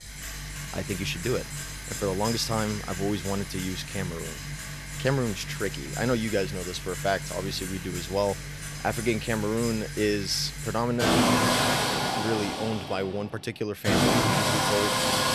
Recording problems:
machinery noise; very loud; throughout; 1 dB above the speech

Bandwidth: 13.5 kHz